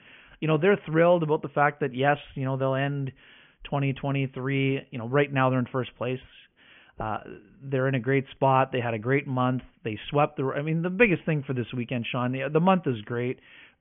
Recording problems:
high frequencies cut off; severe; nothing above 3.5 kHz

